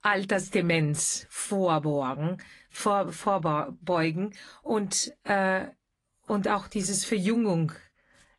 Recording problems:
garbled, watery; slightly; nothing above 10.5 kHz

